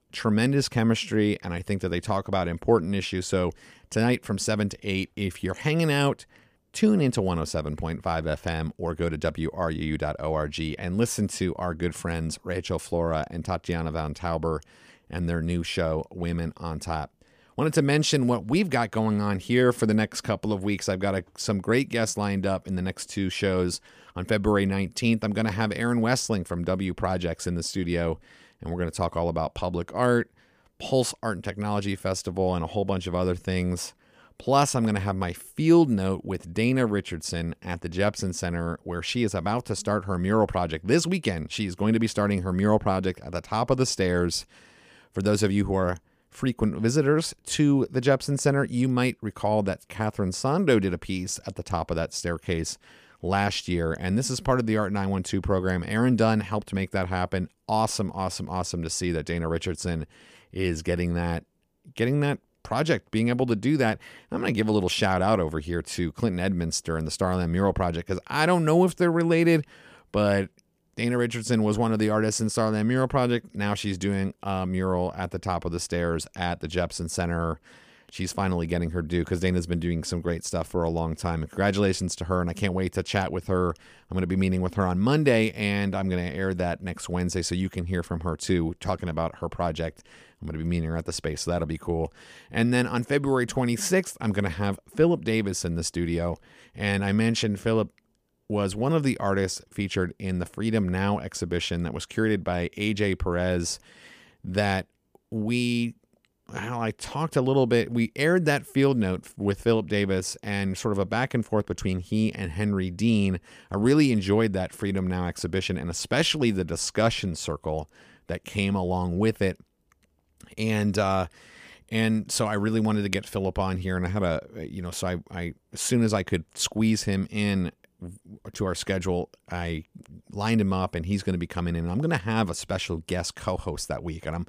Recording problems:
none

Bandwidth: 15 kHz